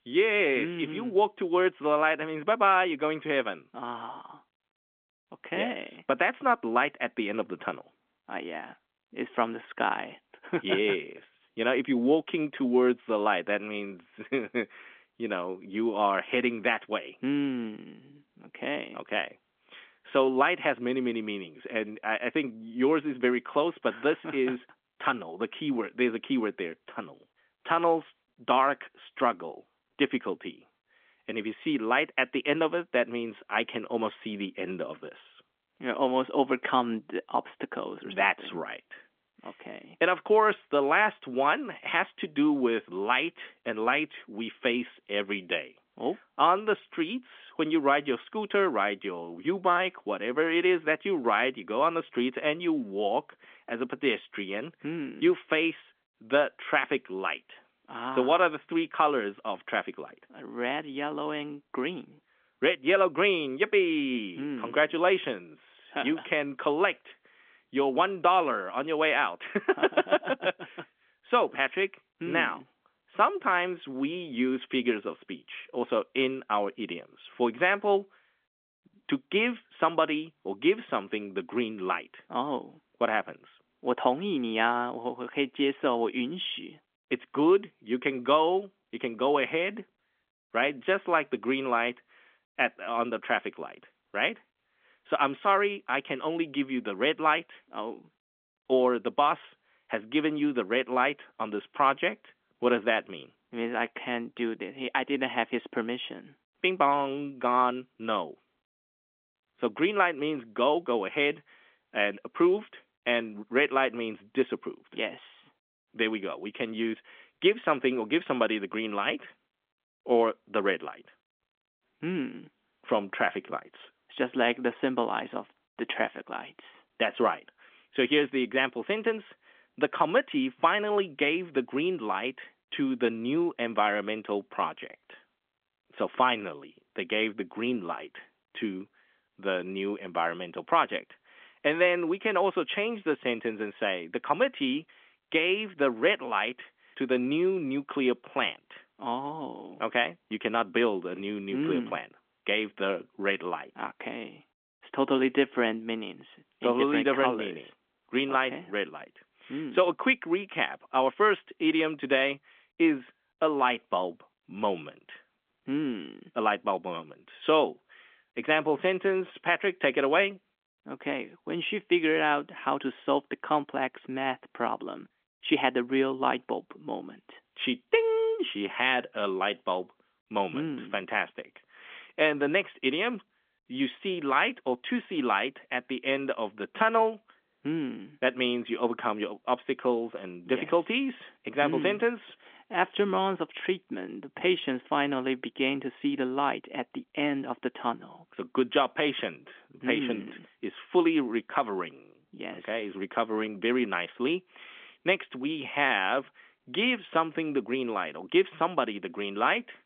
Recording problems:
phone-call audio; nothing above 3.5 kHz

